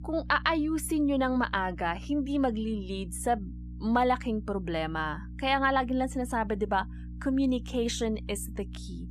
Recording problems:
electrical hum; faint; throughout; 60 Hz, 25 dB below the speech

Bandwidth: 13.5 kHz